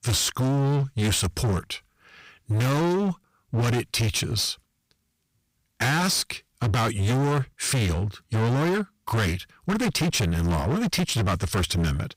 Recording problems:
distortion; heavy; 26% of the sound clipped

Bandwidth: 15.5 kHz